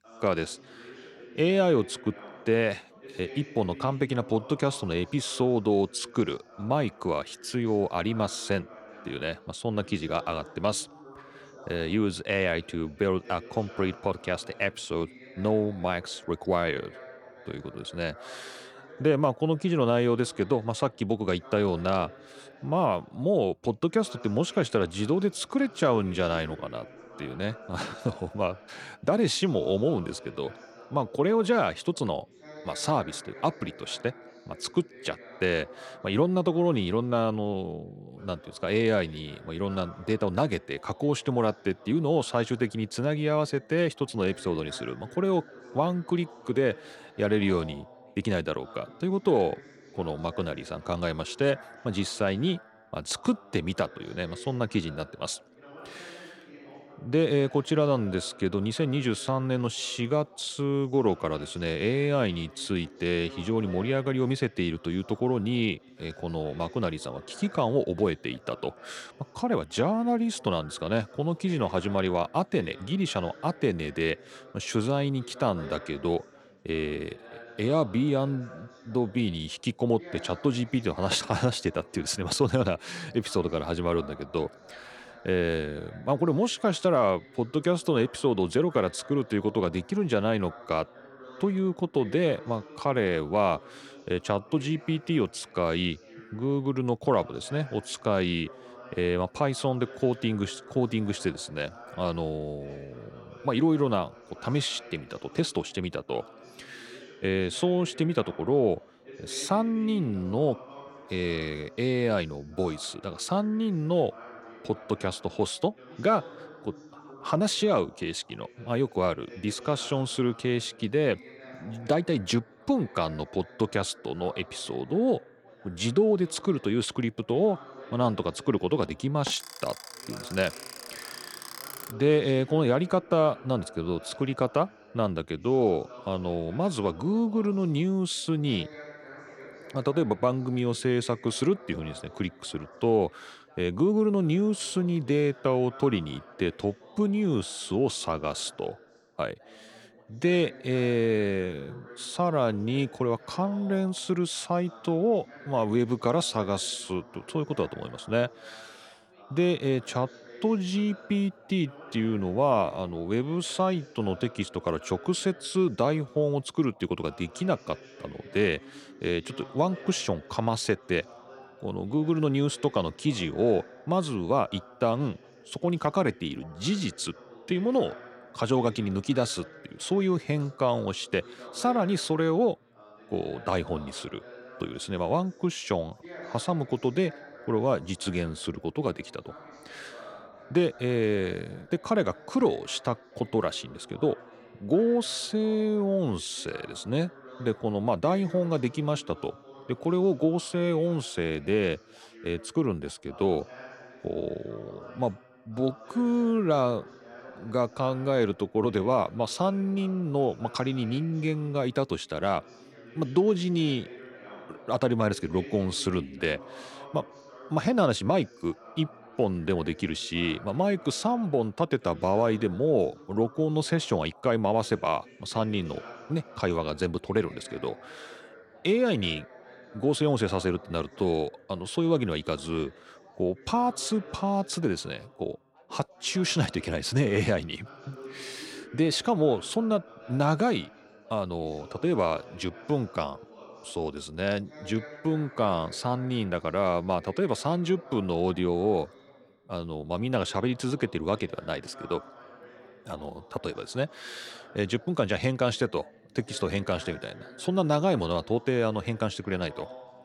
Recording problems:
background chatter; noticeable; throughout; 3 voices, 20 dB below the speech
alarm; noticeable; from 2:09 to 2:12; peak 10 dB below the speech

